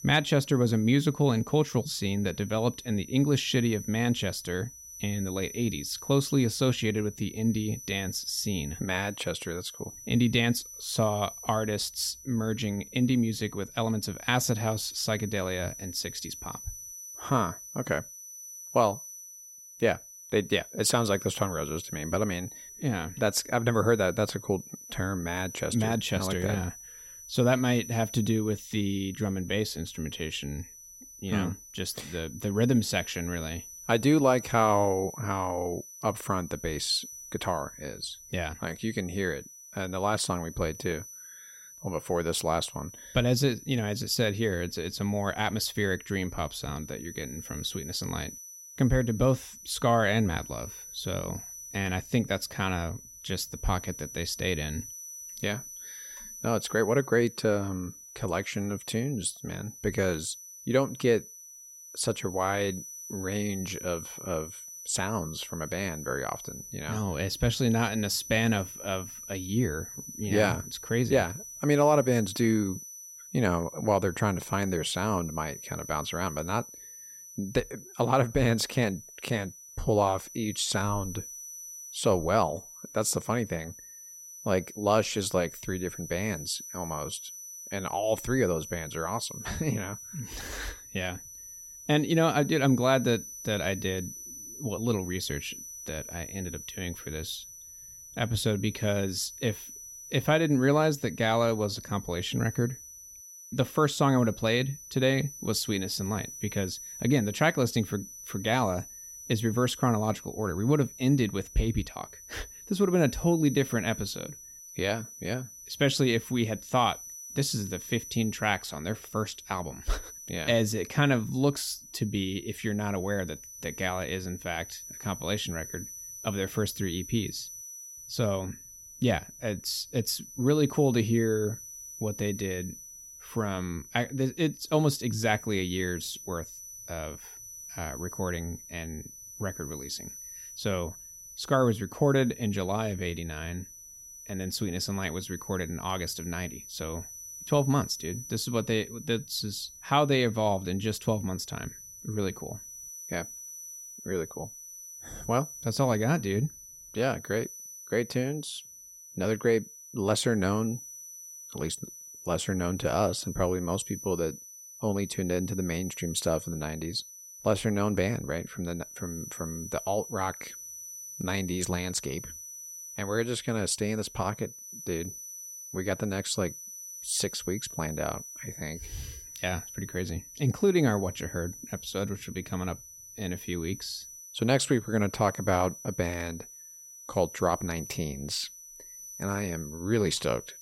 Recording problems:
high-pitched whine; noticeable; throughout; 6 kHz, 15 dB below the speech

